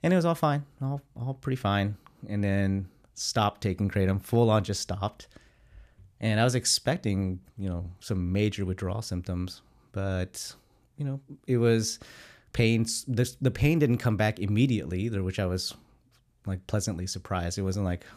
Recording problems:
none

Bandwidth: 14.5 kHz